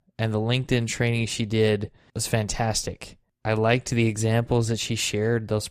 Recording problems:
none

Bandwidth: 14.5 kHz